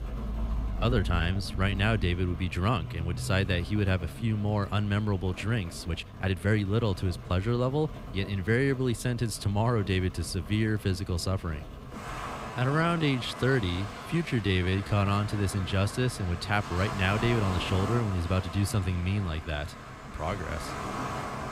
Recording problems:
rain or running water; loud; throughout; 10 dB below the speech
uneven, jittery; strongly; from 0.5 to 15 s

